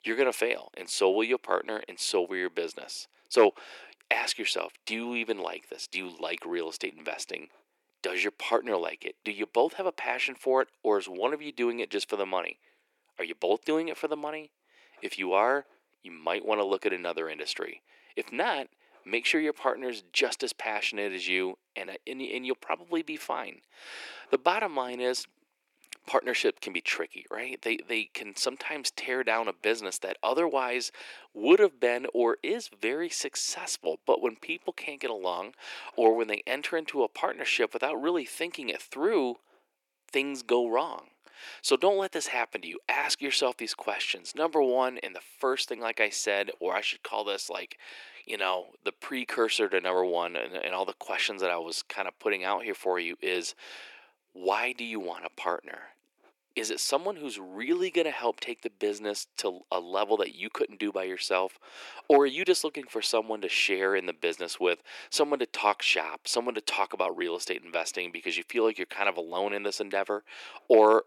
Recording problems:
thin; very; fading below 350 Hz

